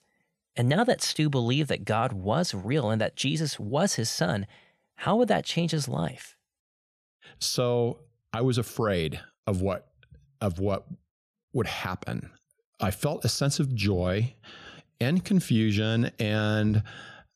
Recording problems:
none

